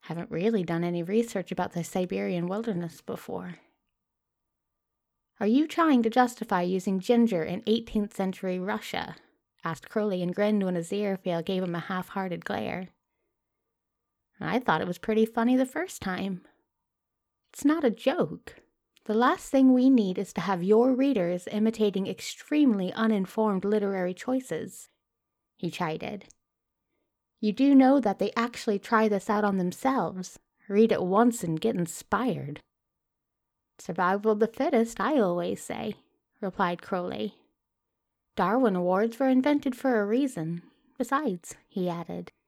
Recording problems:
uneven, jittery; strongly; from 2.5 to 42 s

